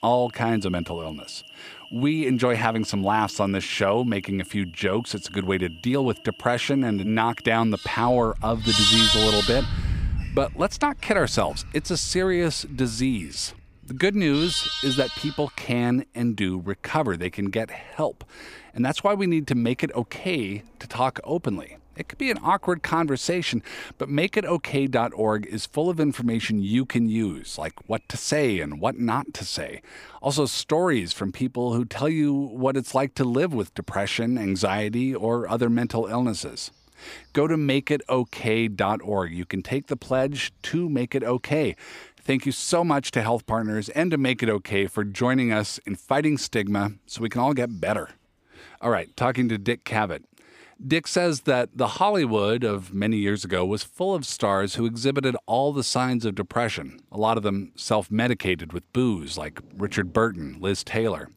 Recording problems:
animal sounds; loud; throughout; 3 dB below the speech

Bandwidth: 15 kHz